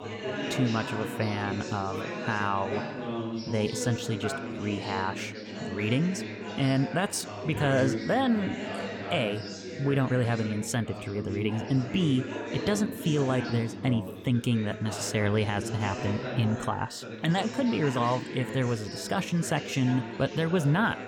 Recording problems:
background chatter; loud; throughout; 4 voices, 7 dB below the speech

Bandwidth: 17.5 kHz